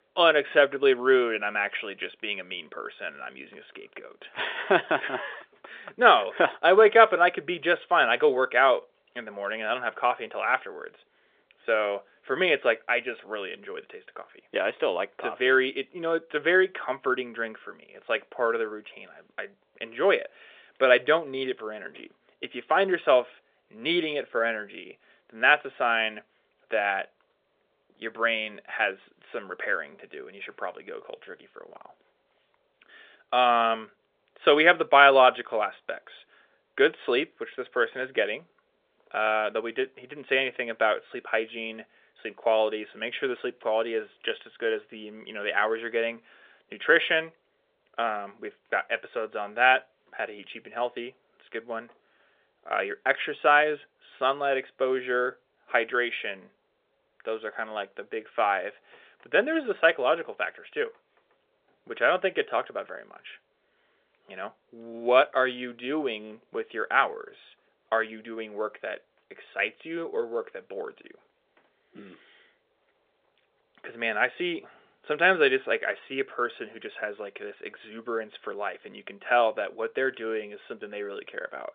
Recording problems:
phone-call audio; nothing above 3.5 kHz

